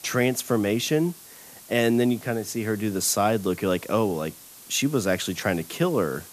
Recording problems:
hiss; noticeable; throughout; 20 dB below the speech

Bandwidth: 14.5 kHz